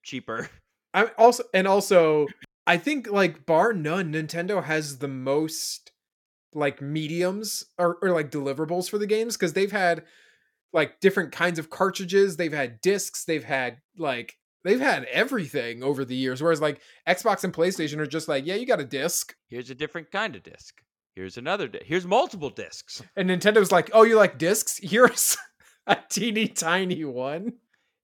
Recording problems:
none

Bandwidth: 17 kHz